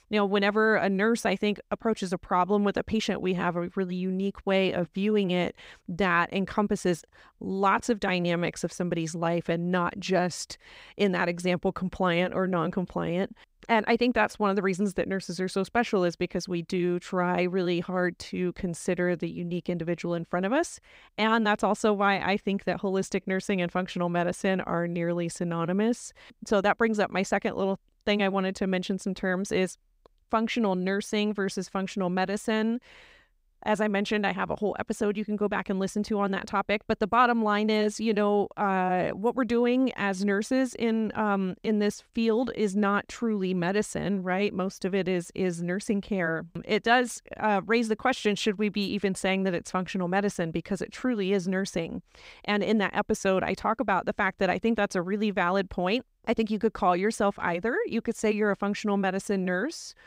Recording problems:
none

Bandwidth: 15.5 kHz